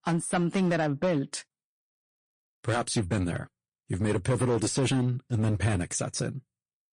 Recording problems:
distortion; slight; 7% of the sound clipped
garbled, watery; slightly; nothing above 9 kHz

